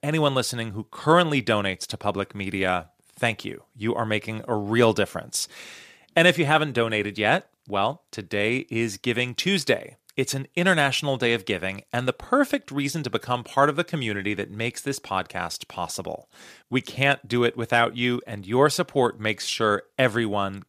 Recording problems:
none

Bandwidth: 14.5 kHz